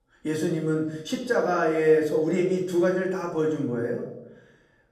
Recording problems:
off-mic speech; far
room echo; slight; dies away in 0.7 s

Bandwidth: 15 kHz